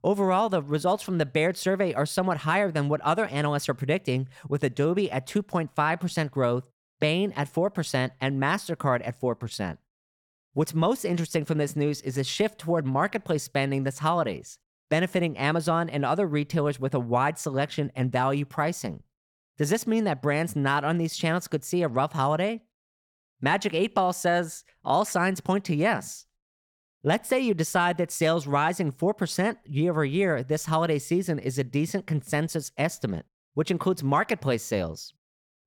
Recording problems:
none

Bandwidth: 17 kHz